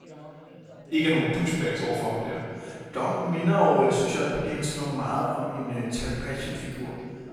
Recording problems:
room echo; strong; dies away in 1.9 s
off-mic speech; far
background chatter; faint; throughout; 3 voices, 20 dB below the speech

